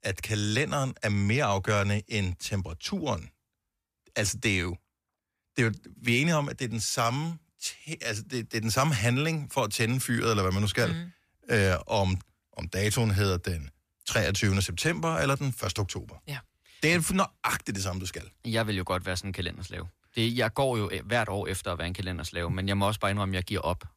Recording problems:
none

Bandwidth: 14.5 kHz